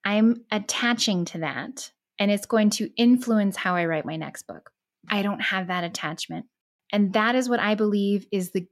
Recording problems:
none

